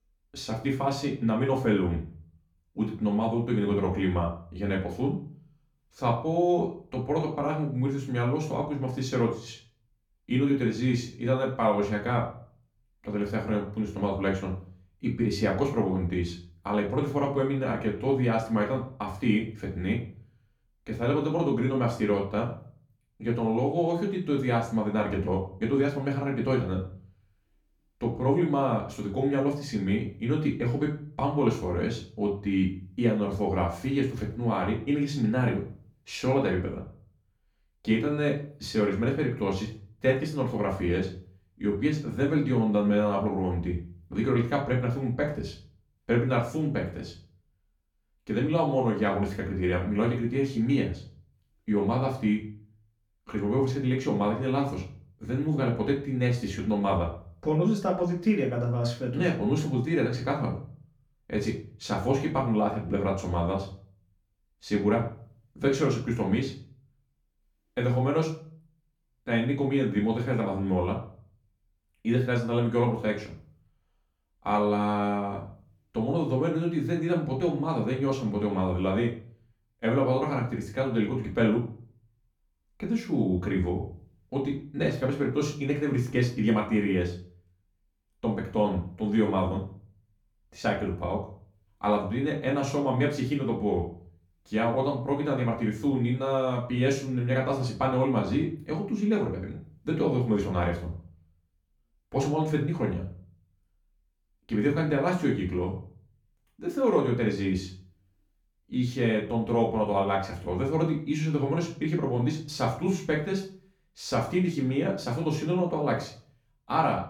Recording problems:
off-mic speech; far
room echo; slight; dies away in 0.4 s

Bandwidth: 18 kHz